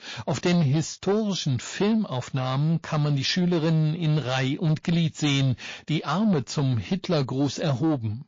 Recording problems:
distortion; slight; 10 dB below the speech
garbled, watery; slightly

